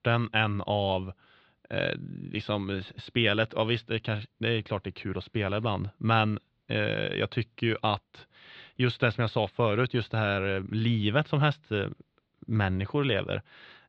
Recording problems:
muffled; slightly; fading above 4 kHz

